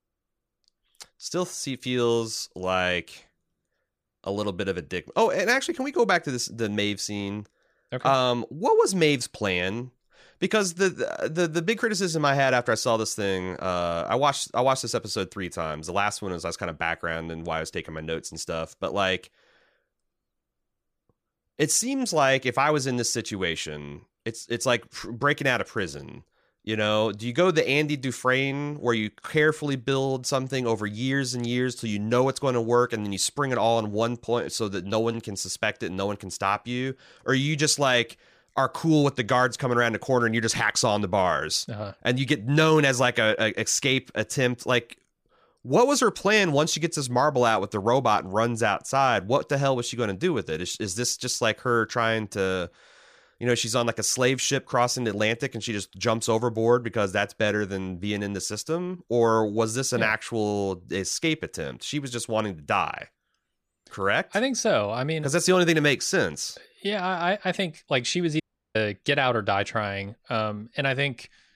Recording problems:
audio cutting out; at 1:08

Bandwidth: 15 kHz